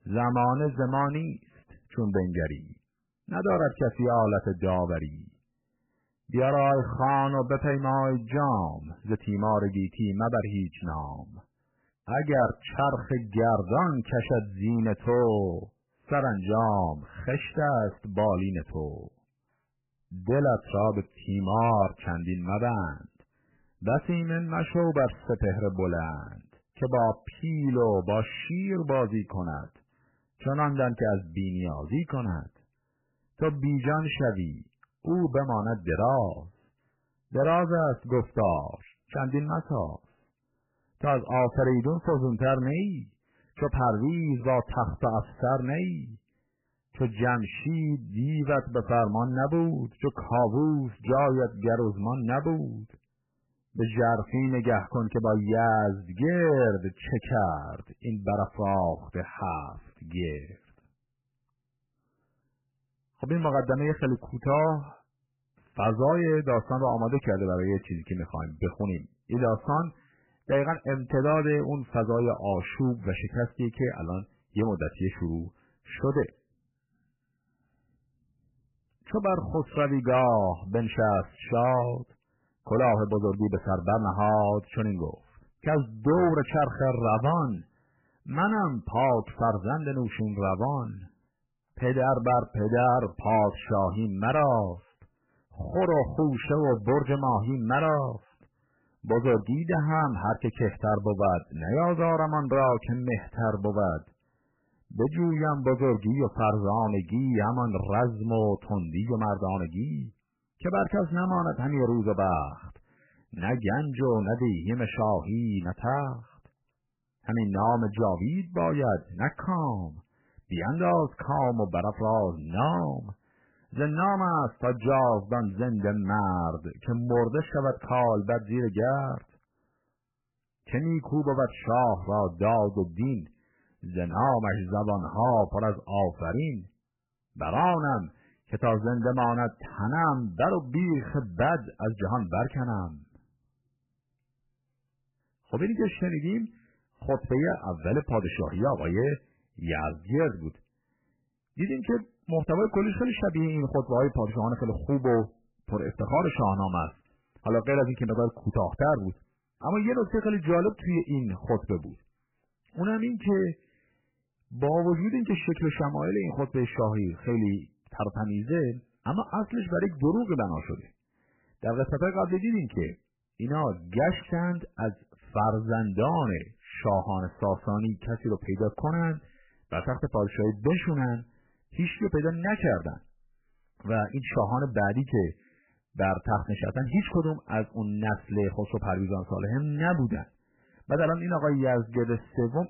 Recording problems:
garbled, watery; badly; nothing above 3 kHz
distortion; slight; 4% of the sound clipped

